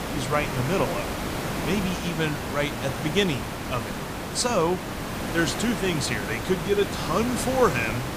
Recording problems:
hiss; loud; throughout; 4 dB below the speech

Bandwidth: 15 kHz